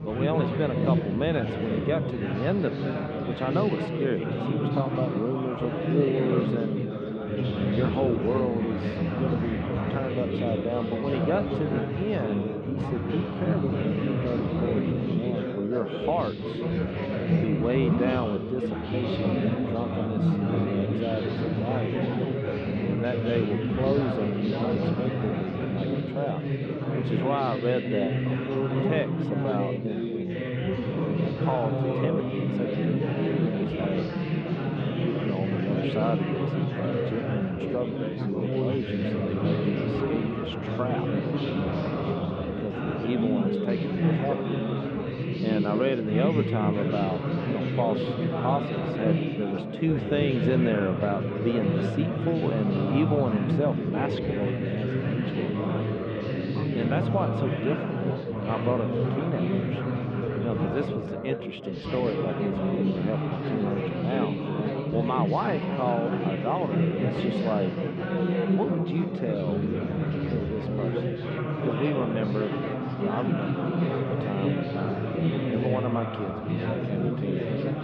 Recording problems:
muffled; very; fading above 3.5 kHz
chatter from many people; very loud; throughout; 3 dB above the speech

